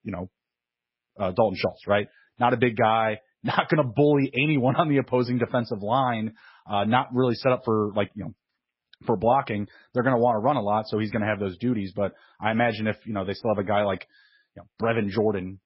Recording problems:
garbled, watery; badly; nothing above 5.5 kHz

